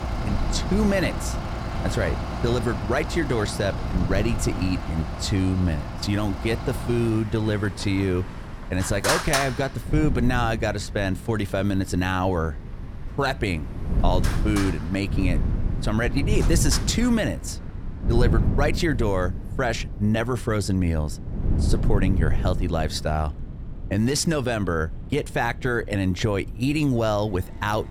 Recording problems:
traffic noise; loud; throughout; 7 dB below the speech
wind noise on the microphone; occasional gusts; 15 dB below the speech

